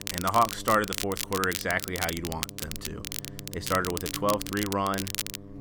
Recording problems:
crackle, like an old record; loud; 6 dB below the speech
electrical hum; faint; throughout; 50 Hz, 20 dB below the speech

